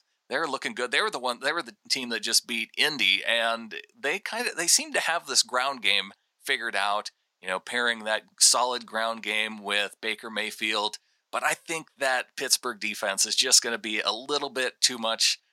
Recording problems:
thin; very; fading below 800 Hz

